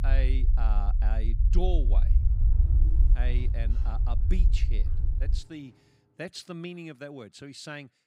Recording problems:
low rumble; loud; until 5.5 s; 7 dB below the speech
door banging; faint; from 2 to 6 s; peak 10 dB below the speech

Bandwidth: 15.5 kHz